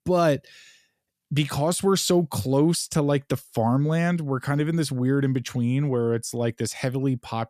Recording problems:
none

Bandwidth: 14.5 kHz